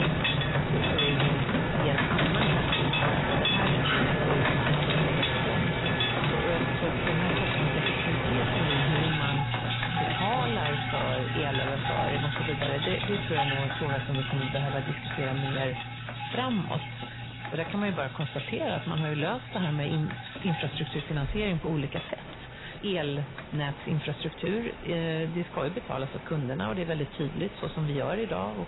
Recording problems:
garbled, watery; badly; nothing above 4 kHz
distortion; slight; 6% of the sound clipped
machinery noise; very loud; throughout; 1 dB above the speech
rain or running water; very loud; throughout; as loud as the speech

